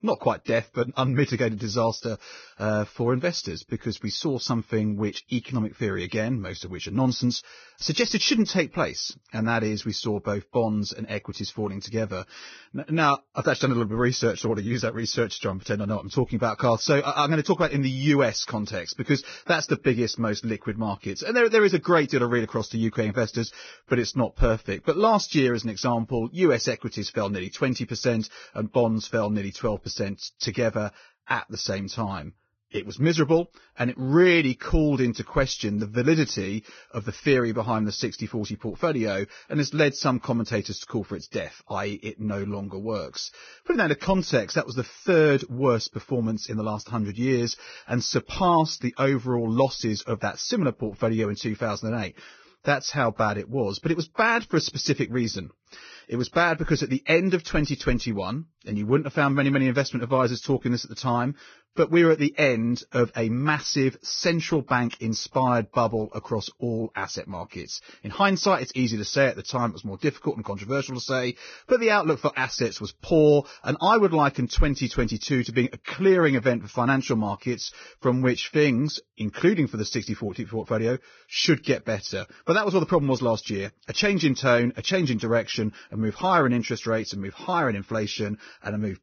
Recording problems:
garbled, watery; badly; nothing above 6 kHz

